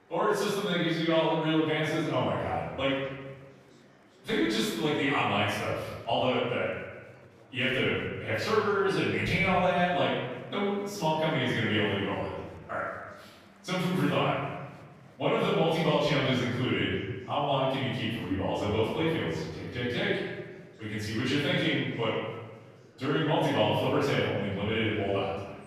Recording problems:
room echo; strong; dies away in 1.3 s
off-mic speech; far
murmuring crowd; faint; throughout; 25 dB below the speech

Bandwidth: 15 kHz